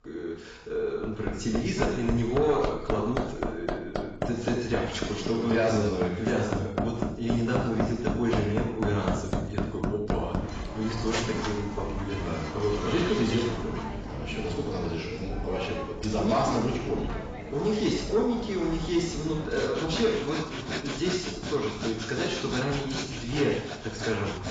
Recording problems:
off-mic speech; far
garbled, watery; badly; nothing above 7.5 kHz
room echo; noticeable; dies away in 0.6 s
distortion; slight; 10 dB below the speech
machinery noise; loud; throughout; 5 dB below the speech

